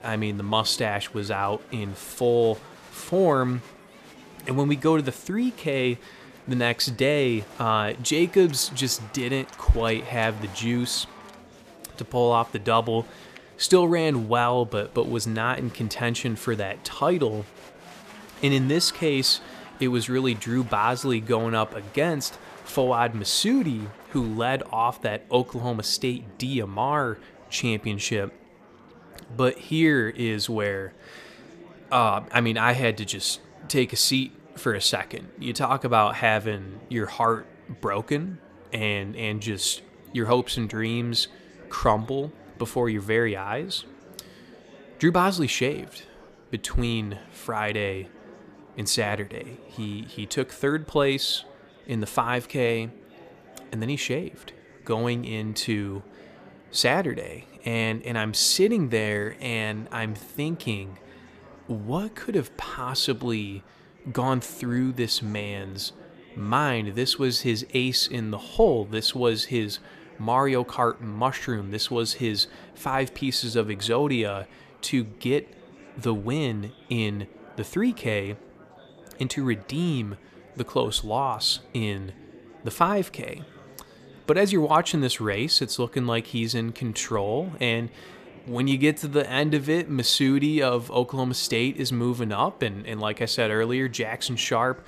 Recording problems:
murmuring crowd; faint; throughout; 25 dB below the speech

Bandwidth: 14.5 kHz